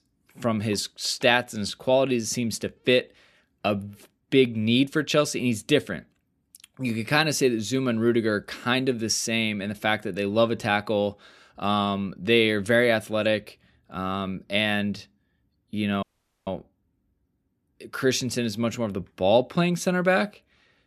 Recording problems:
audio cutting out; at 16 s

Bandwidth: 13.5 kHz